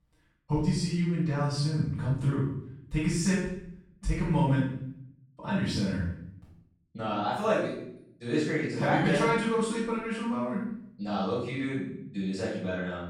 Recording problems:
room echo; strong; dies away in 0.6 s
off-mic speech; far

